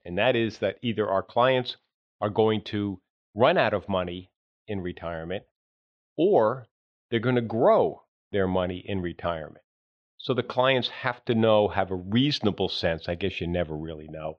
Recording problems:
muffled; slightly; fading above 3.5 kHz

